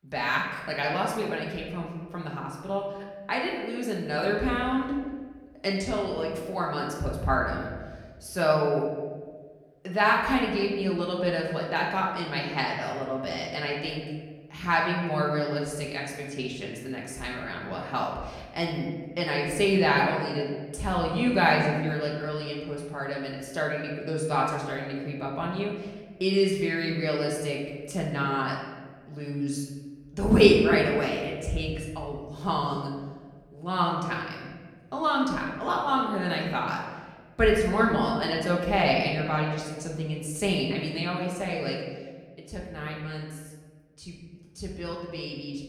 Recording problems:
off-mic speech; far
room echo; noticeable; dies away in 1.2 s

